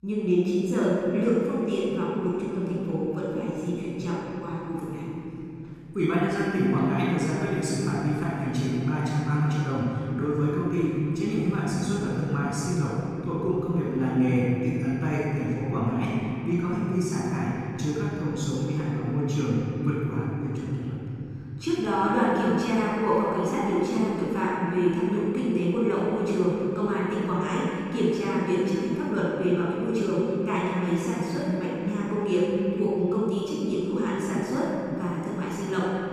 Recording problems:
room echo; strong; dies away in 3 s
off-mic speech; far

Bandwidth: 14 kHz